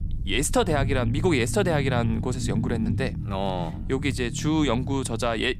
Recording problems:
low rumble; noticeable; throughout; 15 dB below the speech

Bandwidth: 15.5 kHz